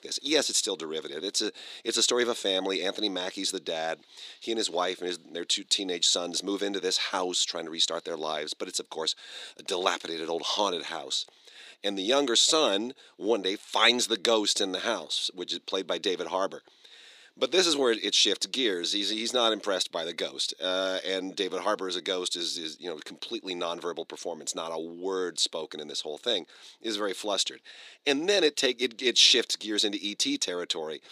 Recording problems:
thin; somewhat; fading below 300 Hz

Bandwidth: 15 kHz